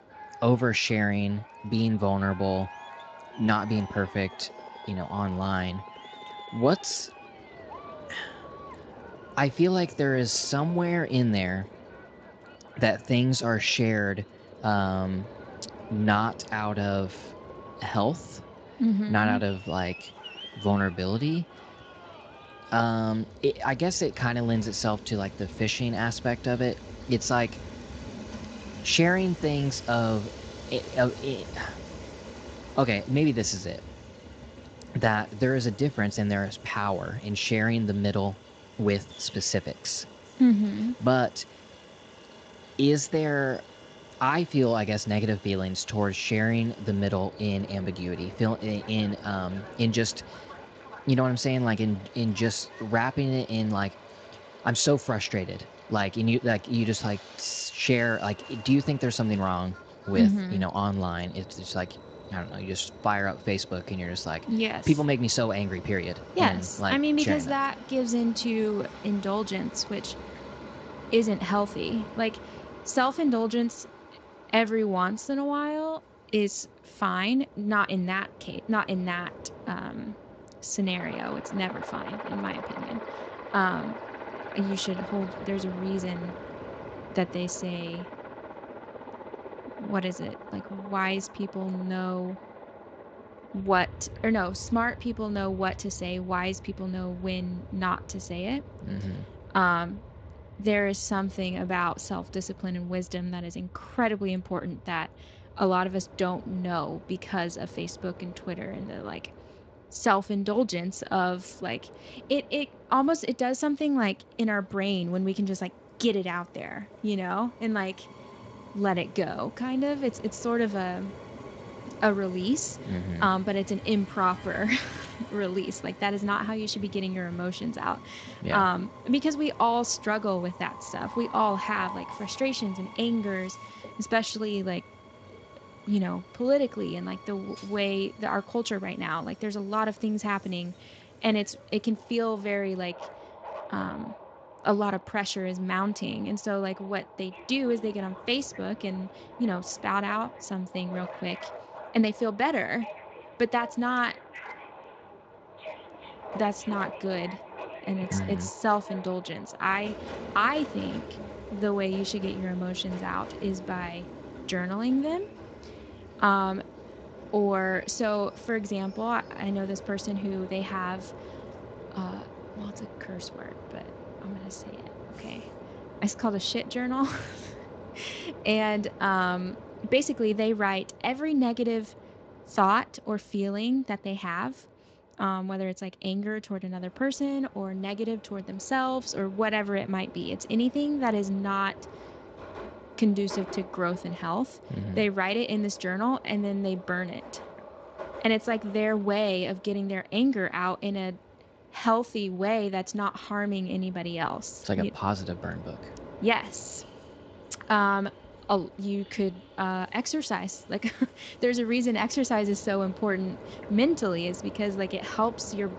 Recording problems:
garbled, watery; slightly; nothing above 7.5 kHz
train or aircraft noise; noticeable; throughout; 15 dB below the speech

